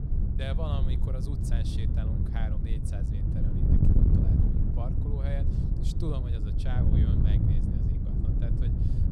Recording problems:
wind noise on the microphone; heavy; 3 dB above the speech

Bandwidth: 17 kHz